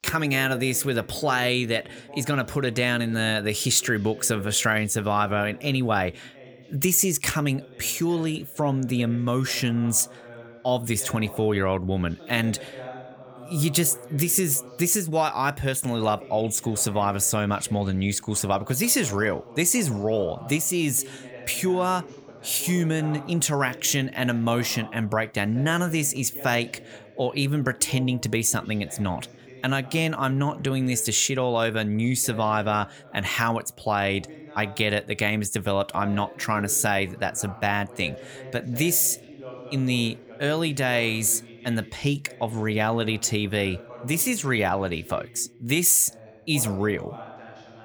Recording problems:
voice in the background; noticeable; throughout; 20 dB below the speech

